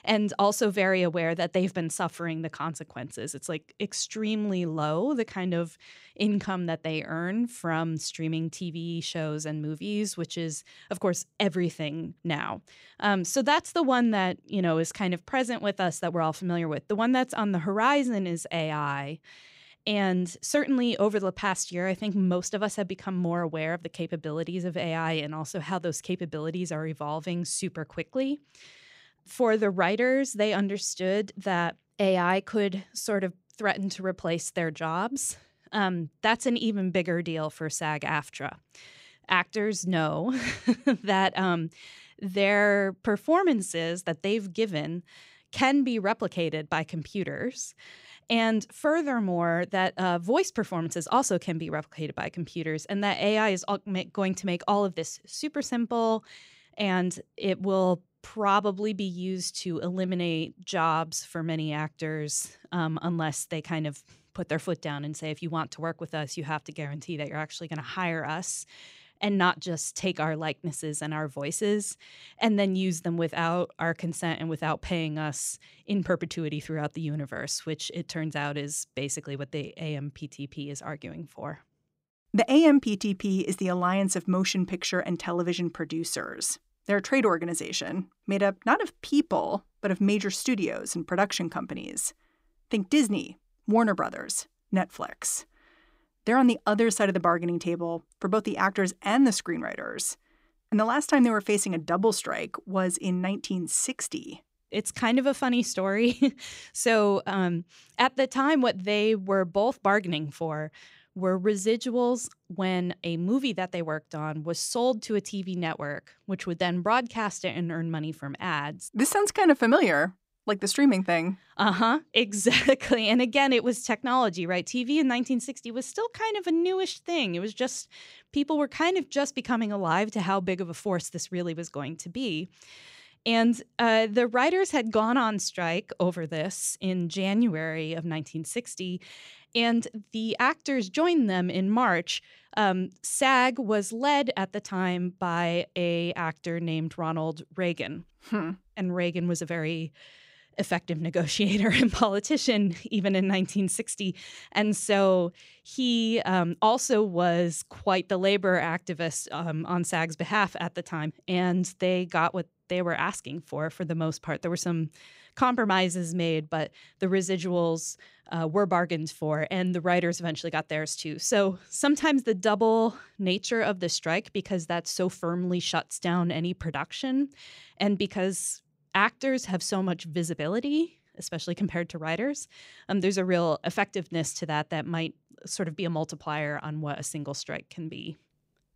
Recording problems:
none

